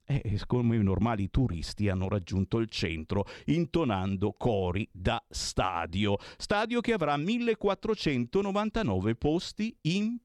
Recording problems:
none

